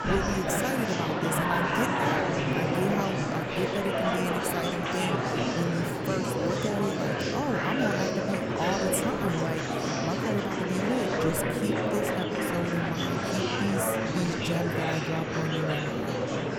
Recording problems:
murmuring crowd; very loud; throughout; 4 dB above the speech

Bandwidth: 18 kHz